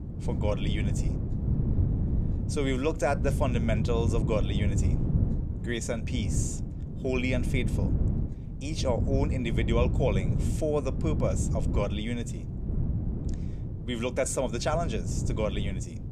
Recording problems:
wind noise on the microphone; heavy; 9 dB below the speech

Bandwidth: 15 kHz